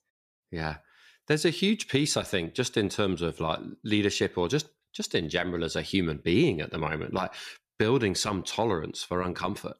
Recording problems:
none

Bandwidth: 14.5 kHz